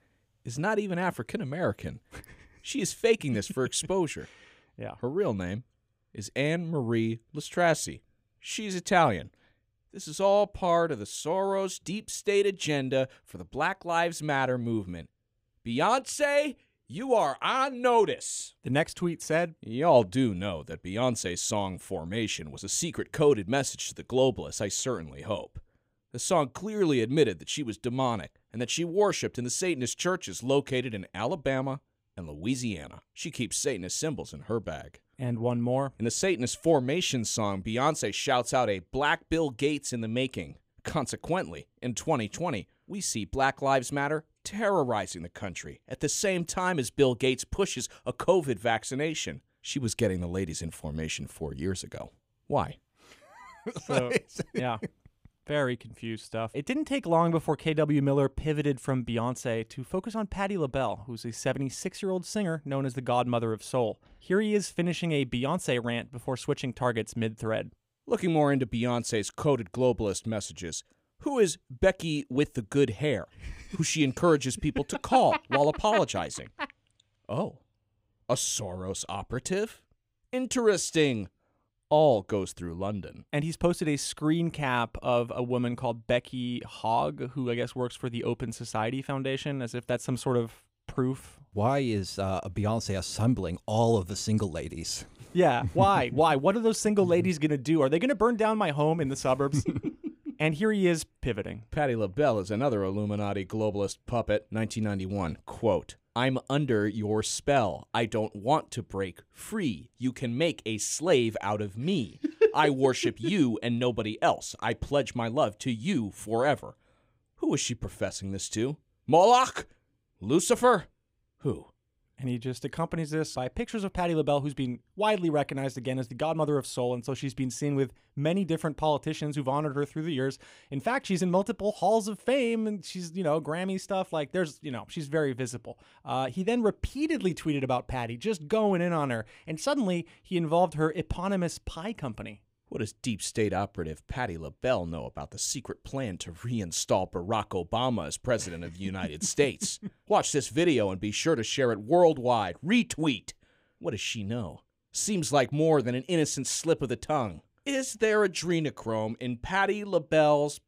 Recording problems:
none

